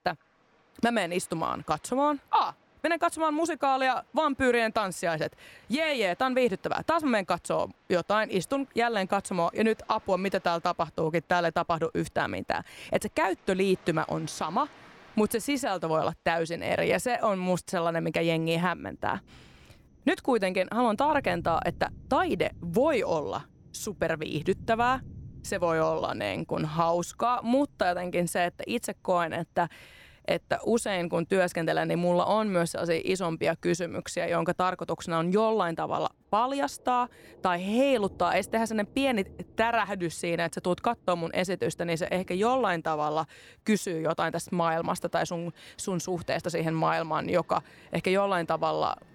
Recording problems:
rain or running water; faint; throughout; 25 dB below the speech

